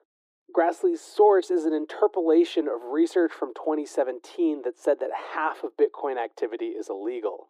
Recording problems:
muffled; very; fading above 1.5 kHz
thin; very; fading below 300 Hz

